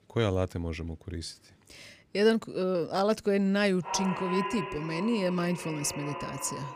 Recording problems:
echo of what is said; strong; from 4 s on; 200 ms later, 8 dB below the speech

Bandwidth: 14.5 kHz